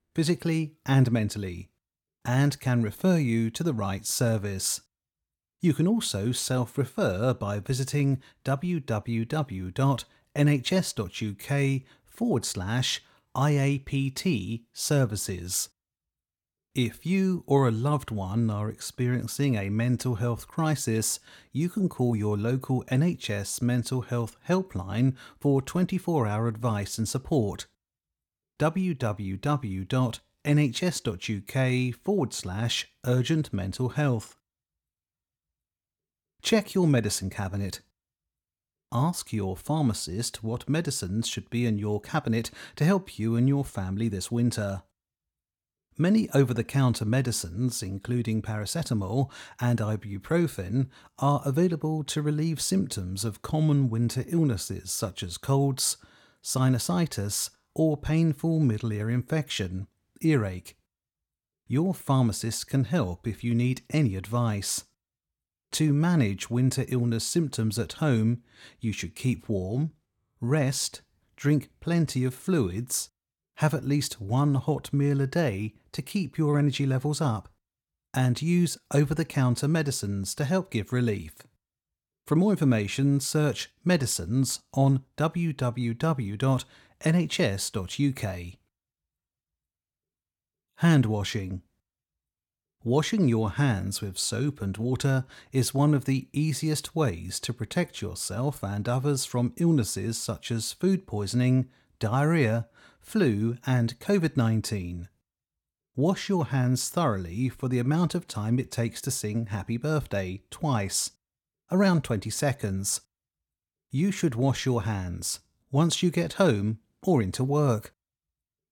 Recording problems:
none

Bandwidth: 17 kHz